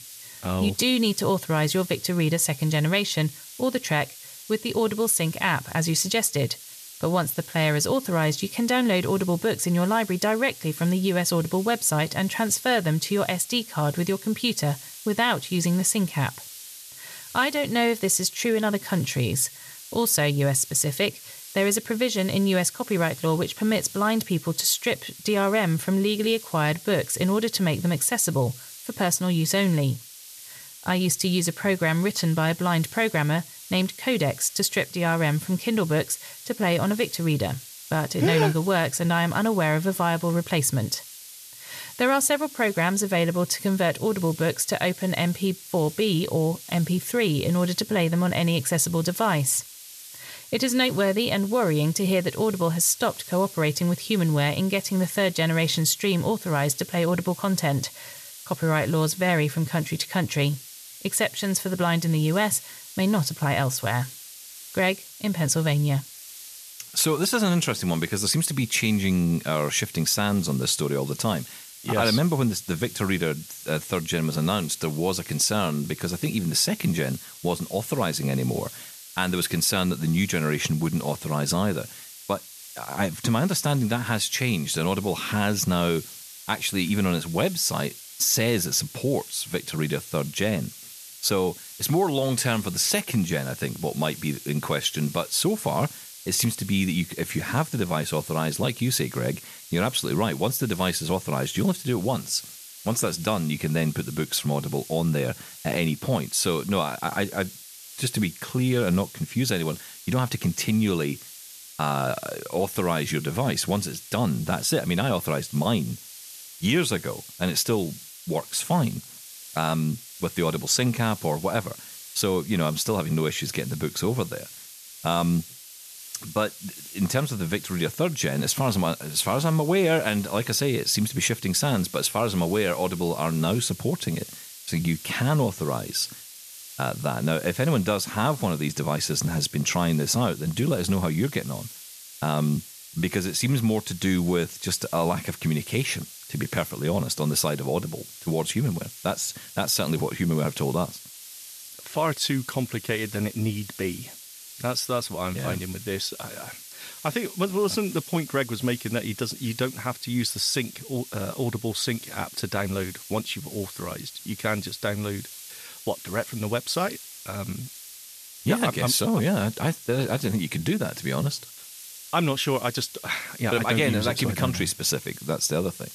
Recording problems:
hiss; noticeable; throughout; 15 dB below the speech

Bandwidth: 14 kHz